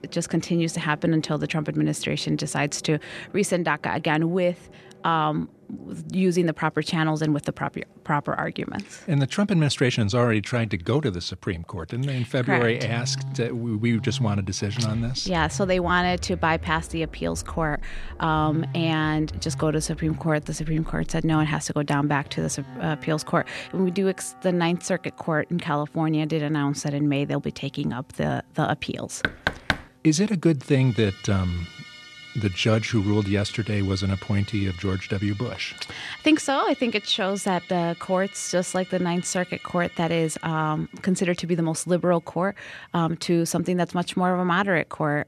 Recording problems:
background music; noticeable; throughout; 15 dB below the speech
door banging; noticeable; at 29 s; peak 1 dB below the speech

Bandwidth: 13.5 kHz